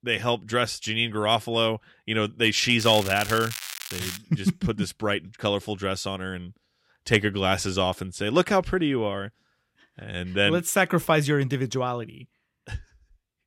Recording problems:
crackling; loud; from 3 to 4 s; 9 dB below the speech

